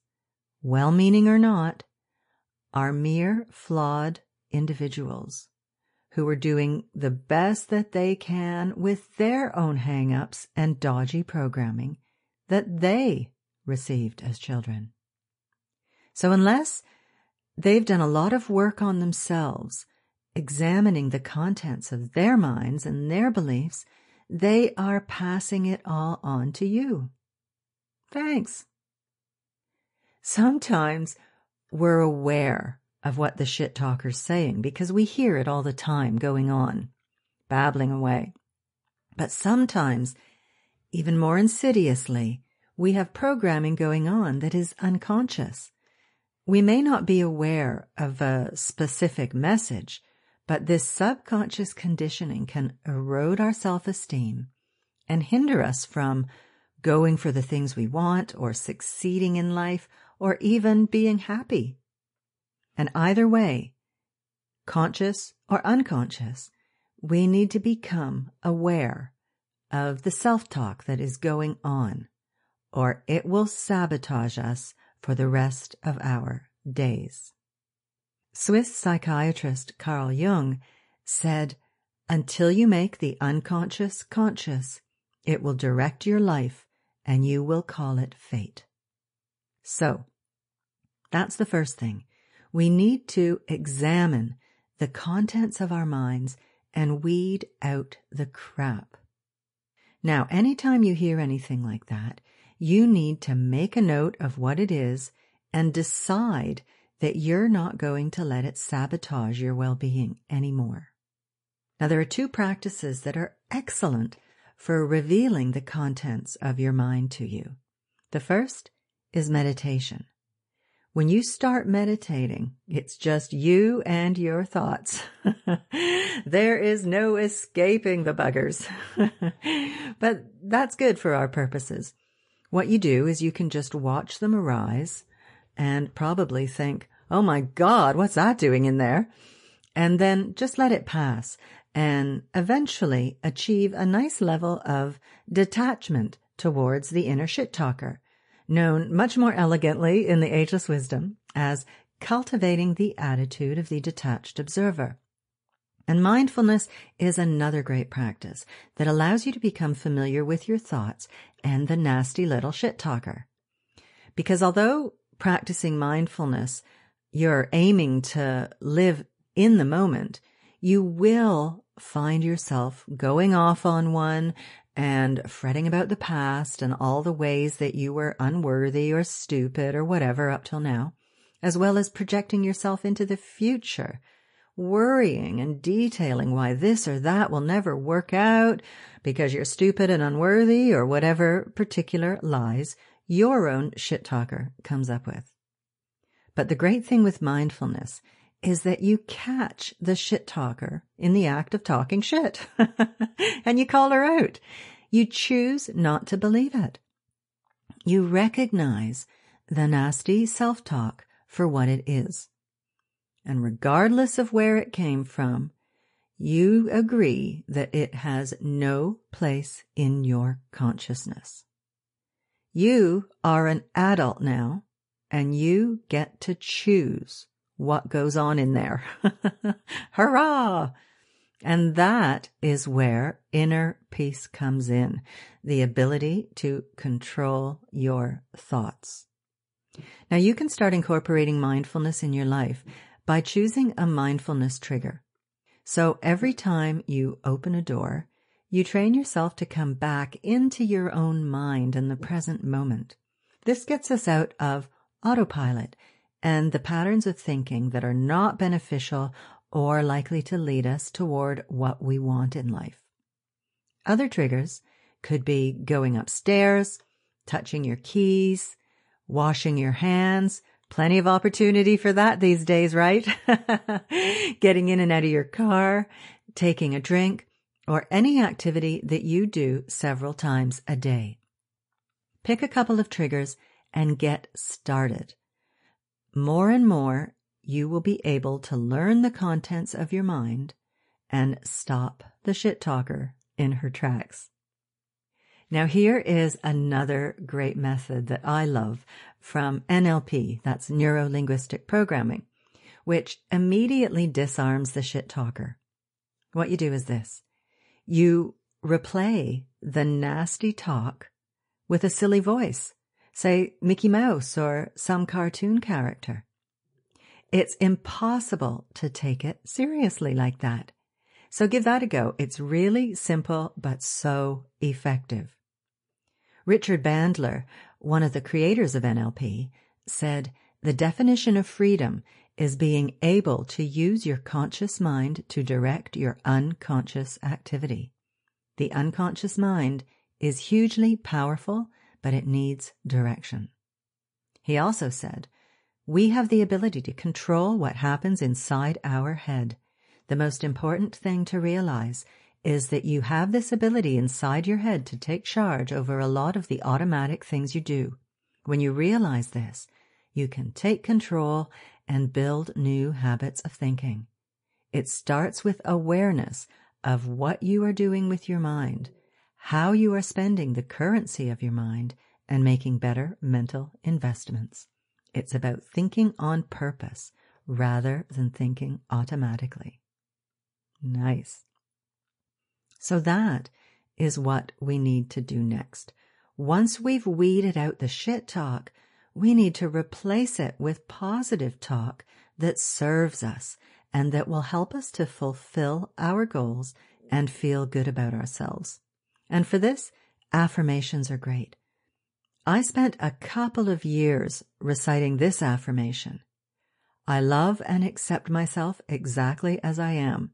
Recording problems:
garbled, watery; slightly; nothing above 10.5 kHz

